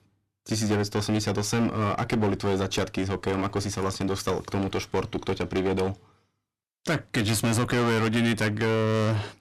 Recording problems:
distortion; heavy; 15% of the sound clipped

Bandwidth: 13.5 kHz